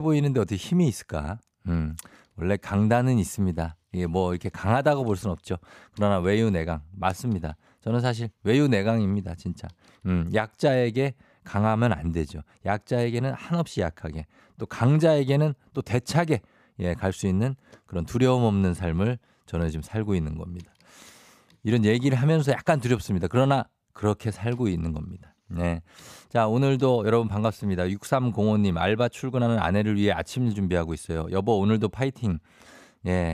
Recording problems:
abrupt cut into speech; at the start and the end

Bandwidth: 15 kHz